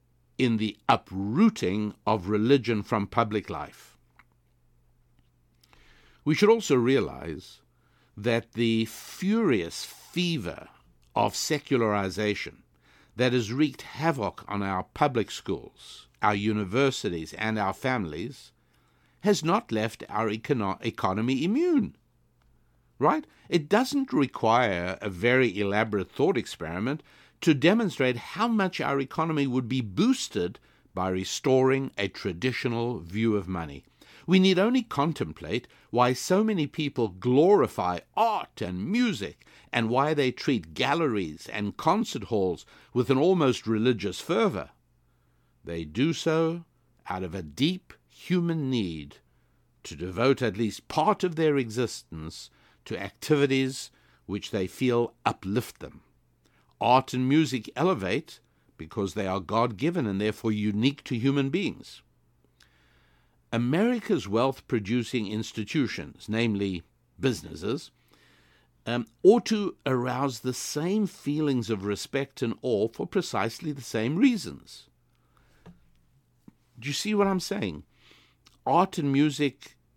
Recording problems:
none

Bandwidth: 17.5 kHz